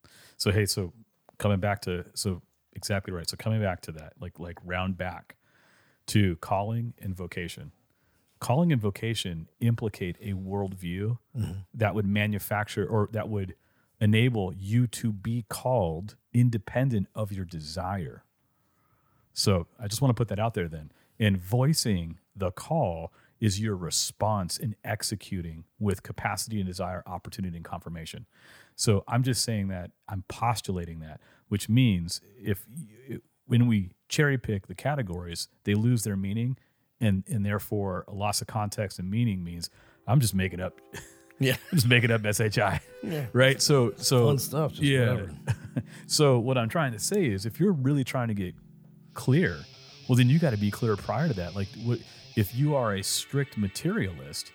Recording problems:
background music; faint; from 40 s on; 20 dB below the speech

